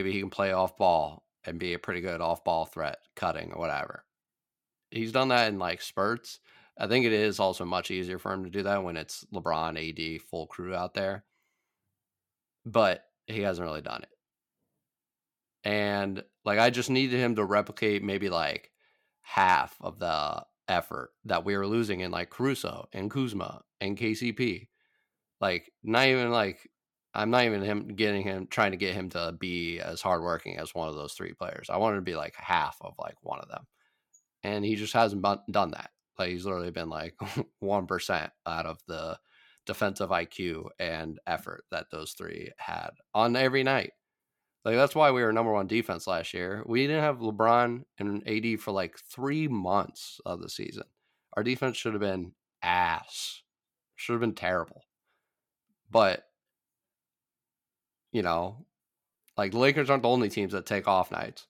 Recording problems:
abrupt cut into speech; at the start

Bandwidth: 17 kHz